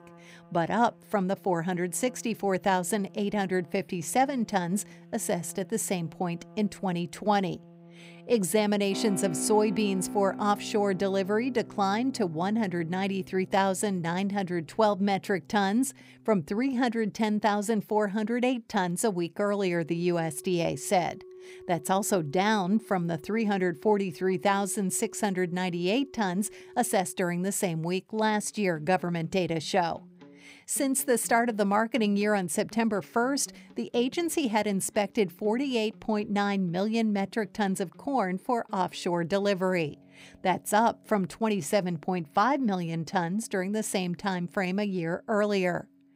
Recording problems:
background music; noticeable; throughout; 20 dB below the speech

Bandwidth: 15.5 kHz